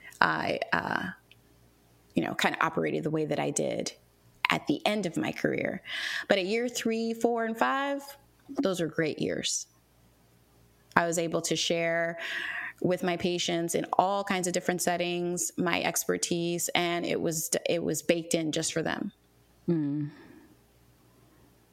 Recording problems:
squashed, flat; heavily

